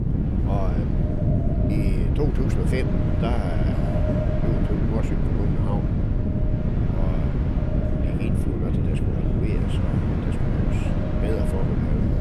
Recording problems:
echo of what is said; strong; throughout; 150 ms later, 6 dB below the speech
wind noise on the microphone; heavy; 2 dB above the speech
train or aircraft noise; loud; throughout; 4 dB below the speech
electrical hum; very faint; until 3.5 s and from 6 to 10 s; 60 Hz, 25 dB below the speech

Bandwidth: 15 kHz